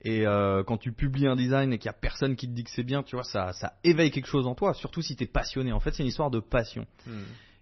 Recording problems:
garbled, watery; slightly; nothing above 6 kHz

